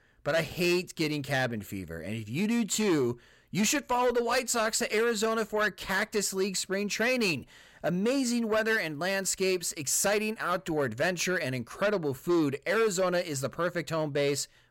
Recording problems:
distortion; slight; 10 dB below the speech

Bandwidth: 16 kHz